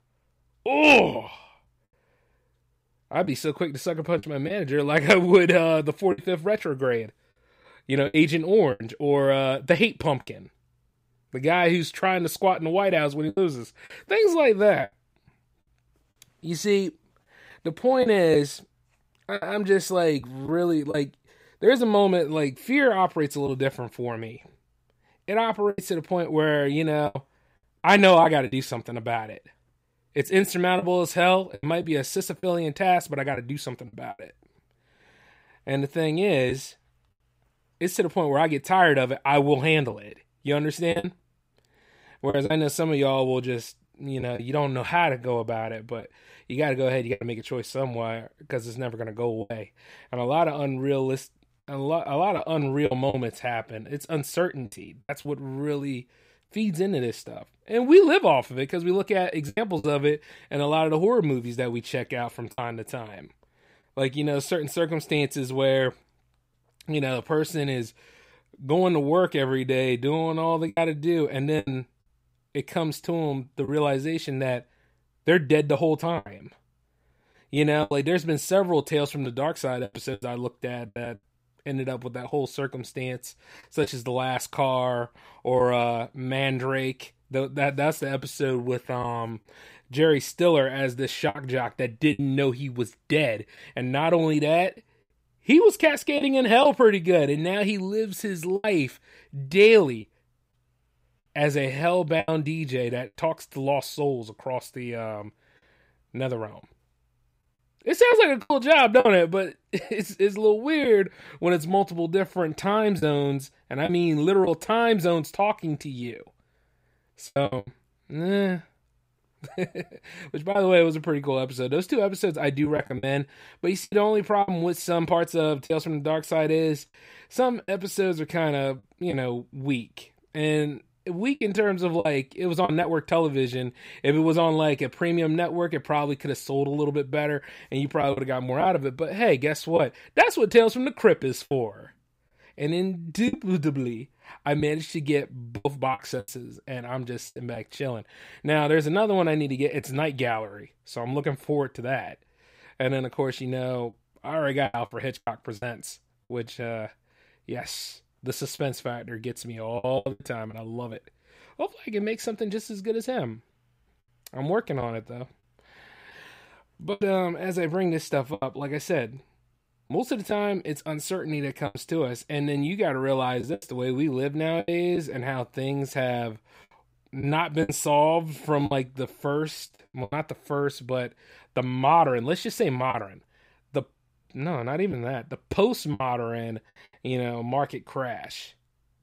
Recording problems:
choppy; occasionally; 4% of the speech affected

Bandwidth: 15.5 kHz